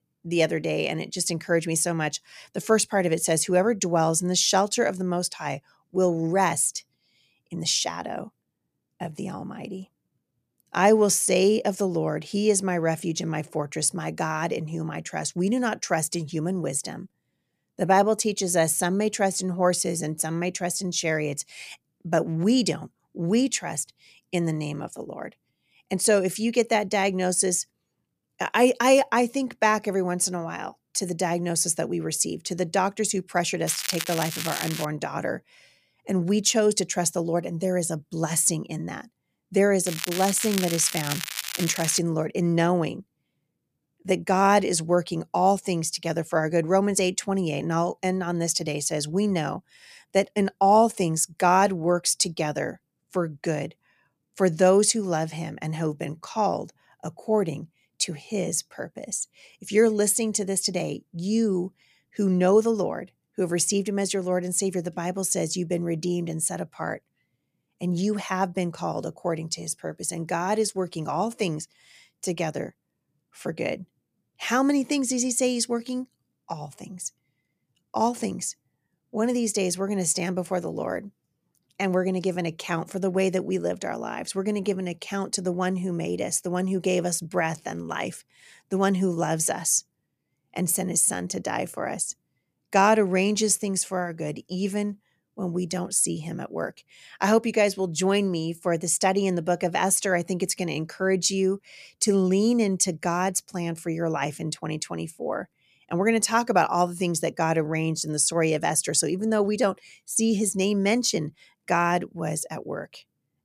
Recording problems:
crackling; loud; from 34 to 35 s and from 40 to 42 s; 6 dB below the speech

